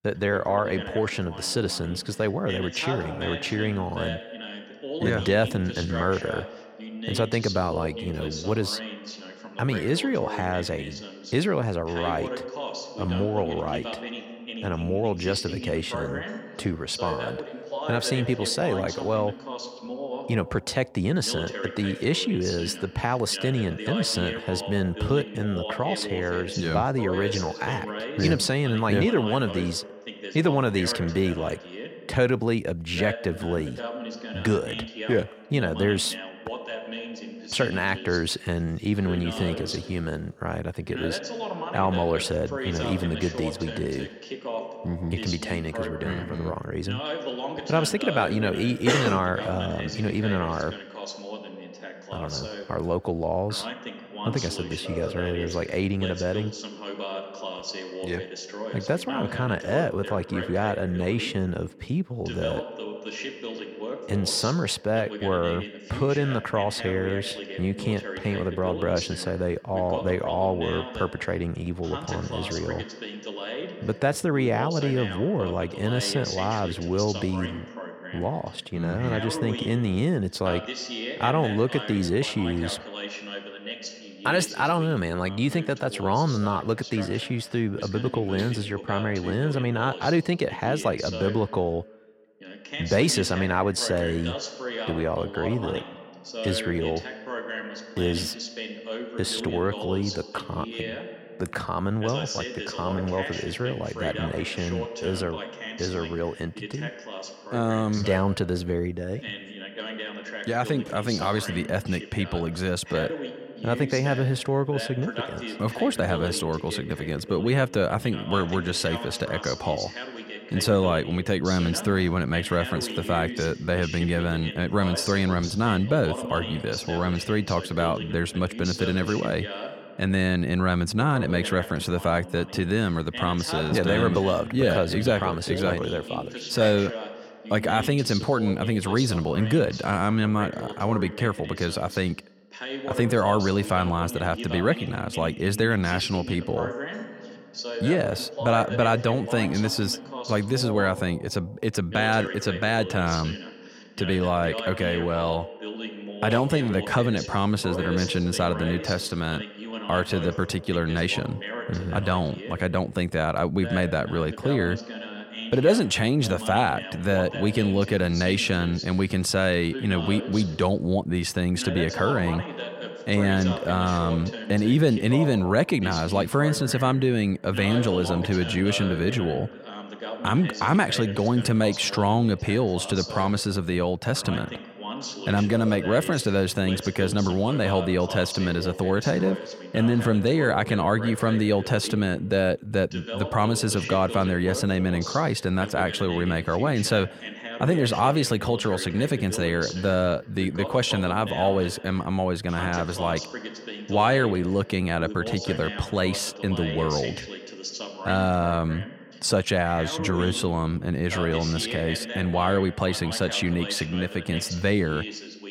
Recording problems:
voice in the background; loud; throughout; 9 dB below the speech

